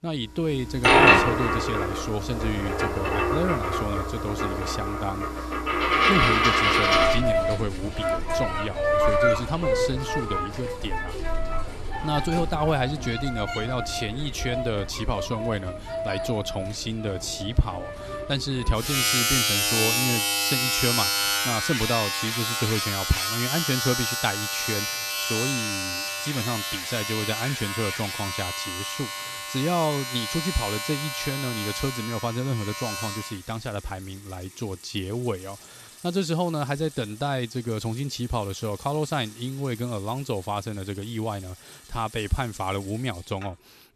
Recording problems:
household noises; very loud; throughout; 4 dB above the speech

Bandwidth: 13.5 kHz